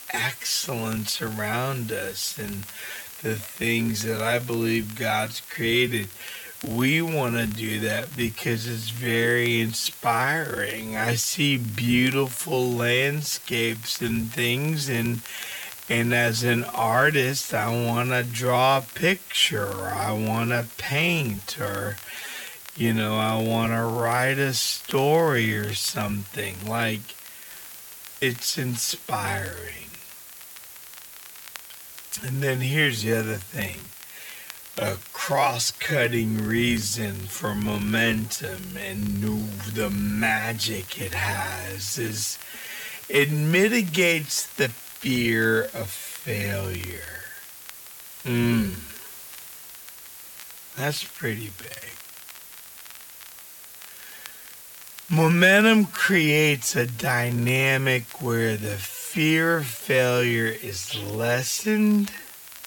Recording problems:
wrong speed, natural pitch; too slow; 0.5 times normal speed
hiss; noticeable; throughout; 15 dB below the speech
crackle, like an old record; faint; 25 dB below the speech

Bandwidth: 17.5 kHz